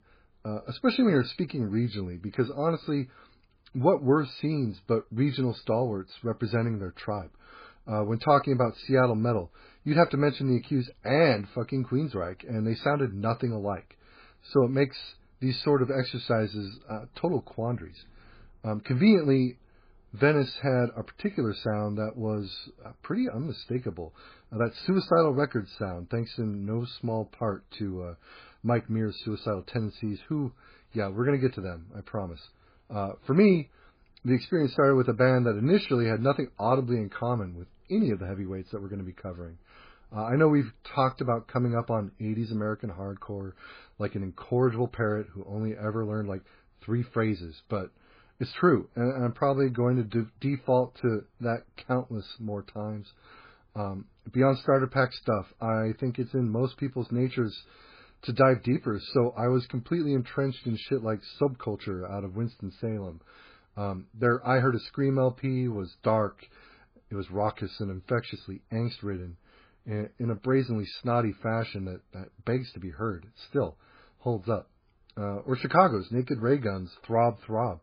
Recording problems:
garbled, watery; badly; nothing above 4.5 kHz

